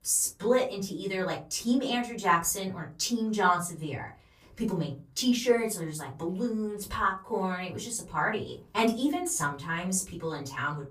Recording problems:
off-mic speech; far
room echo; very slight; dies away in 0.3 s

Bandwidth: 15 kHz